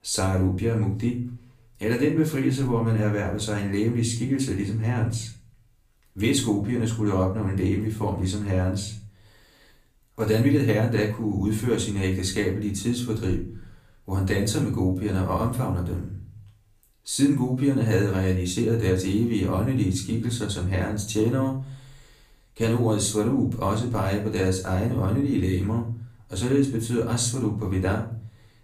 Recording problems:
off-mic speech; far
room echo; slight; dies away in 0.4 s

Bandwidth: 15 kHz